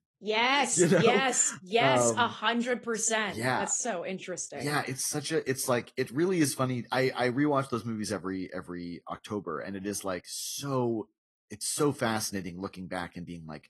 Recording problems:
garbled, watery; slightly; nothing above 12 kHz

